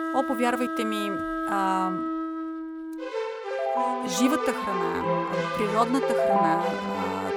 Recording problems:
background music; very loud; throughout; 1 dB above the speech

